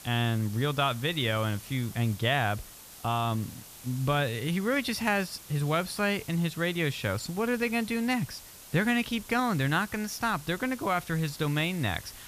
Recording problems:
hiss; noticeable; throughout; 15 dB below the speech

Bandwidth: 14.5 kHz